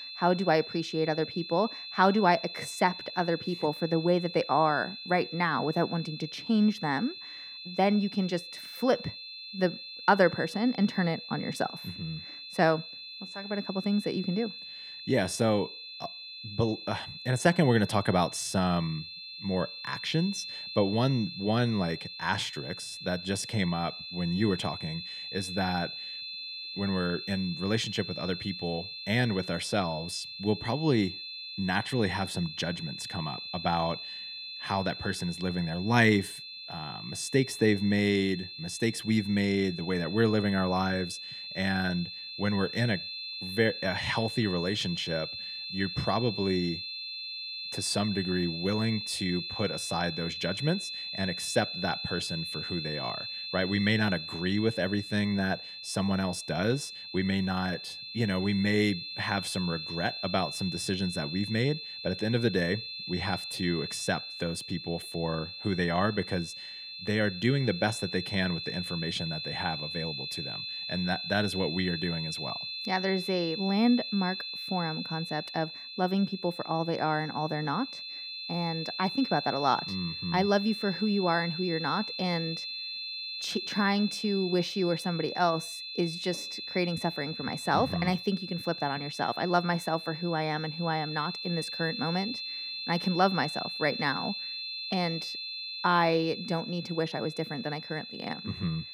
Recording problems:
high-pitched whine; loud; throughout; 4 kHz, 7 dB below the speech

